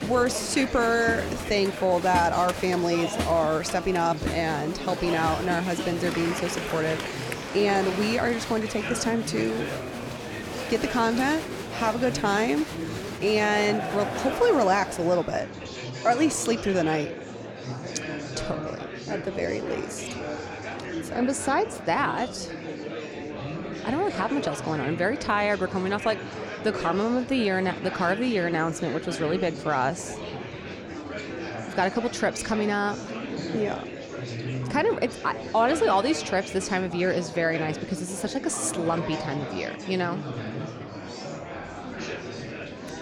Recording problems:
murmuring crowd; loud; throughout; 7 dB below the speech

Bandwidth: 17 kHz